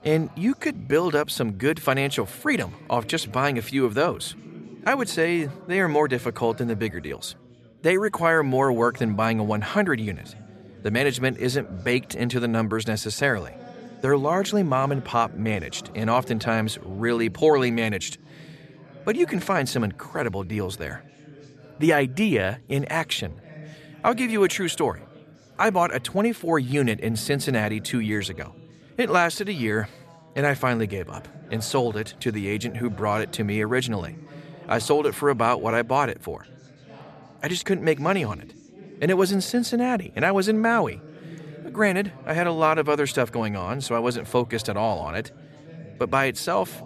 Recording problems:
background chatter; faint; throughout; 3 voices, 20 dB below the speech

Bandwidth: 13.5 kHz